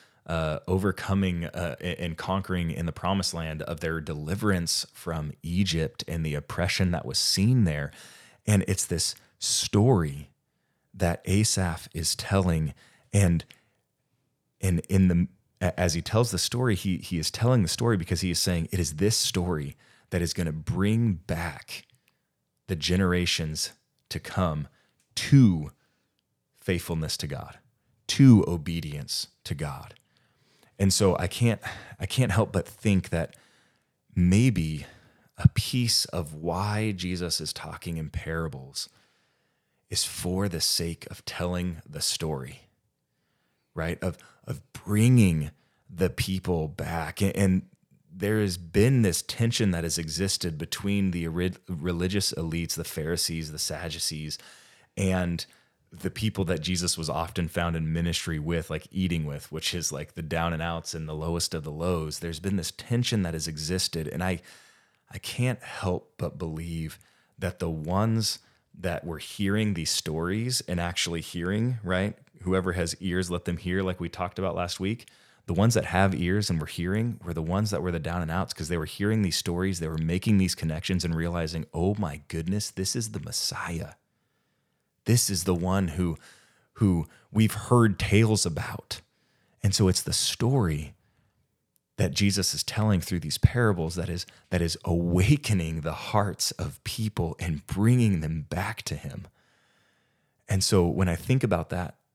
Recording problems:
none

